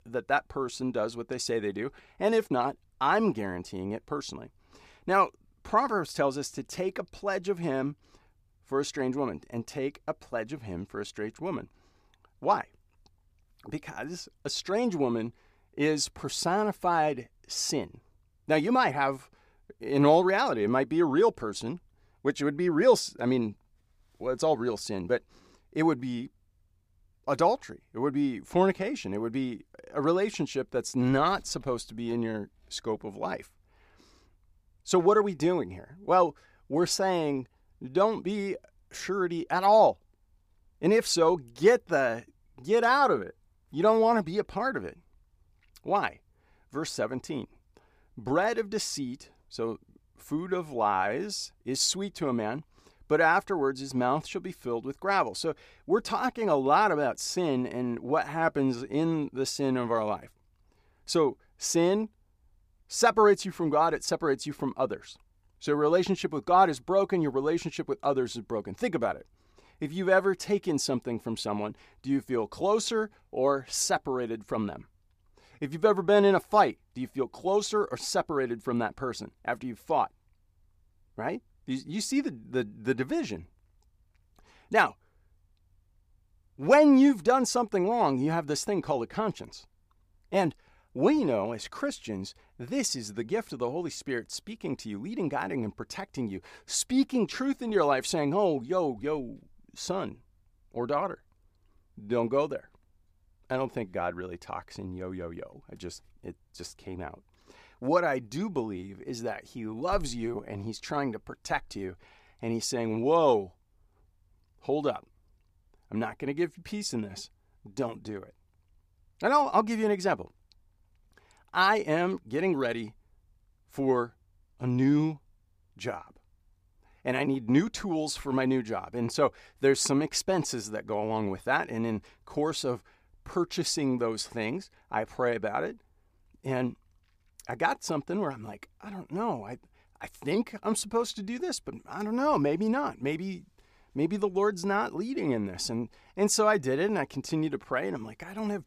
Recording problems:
none

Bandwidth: 15 kHz